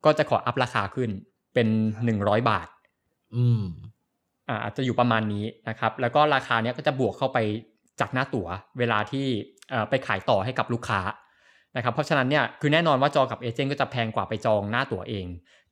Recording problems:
none

